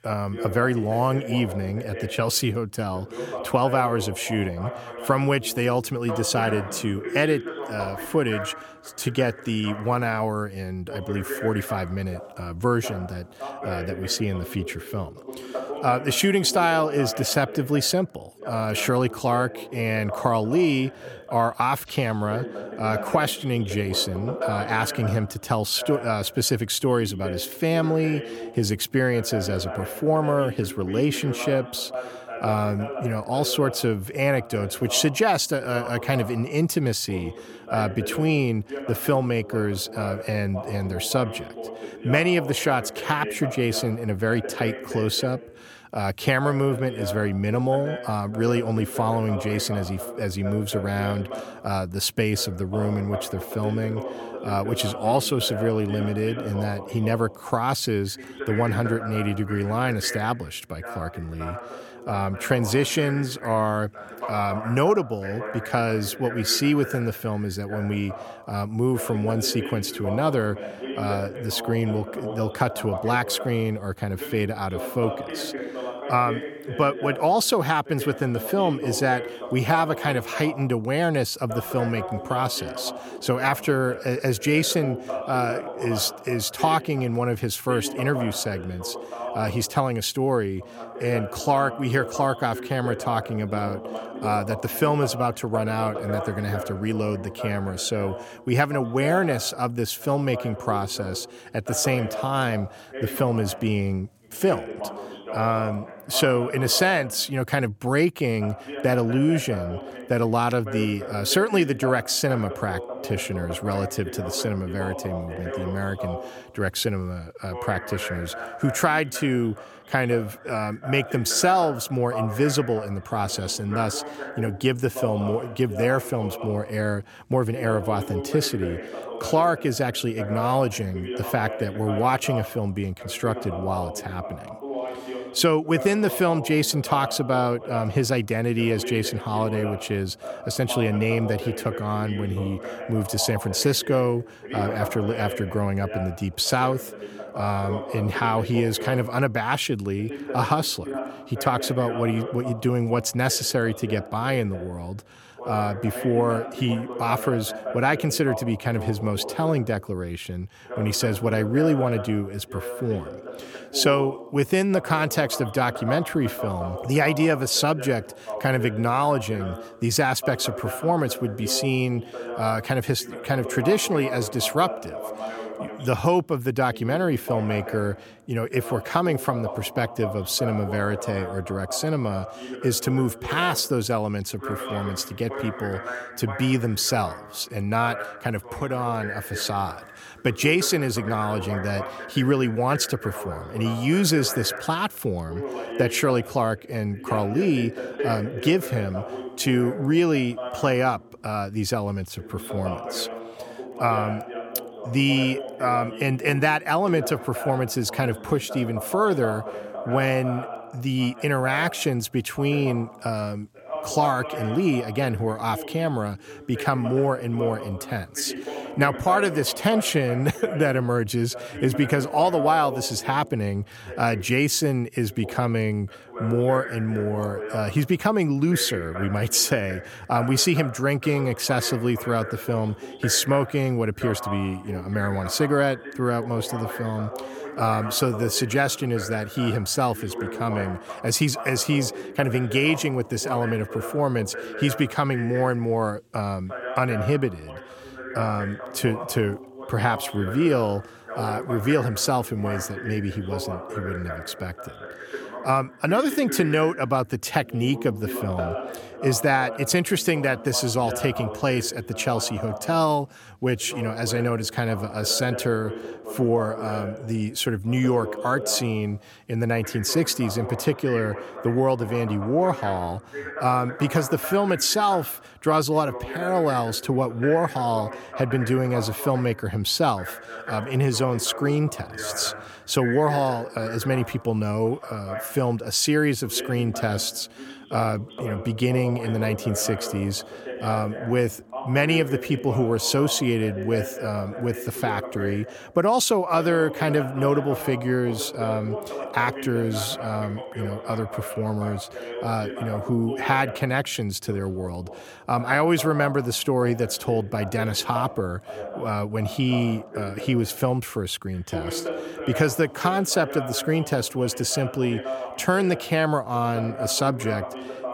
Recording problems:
voice in the background; noticeable; throughout; 10 dB below the speech

